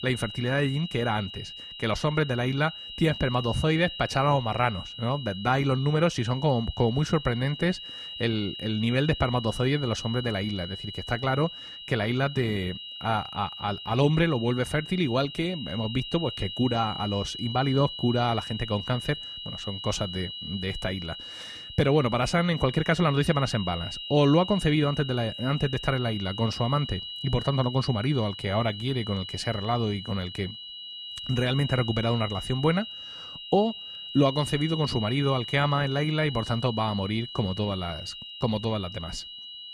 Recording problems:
high-pitched whine; loud; throughout; 3 kHz, 9 dB below the speech

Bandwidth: 14.5 kHz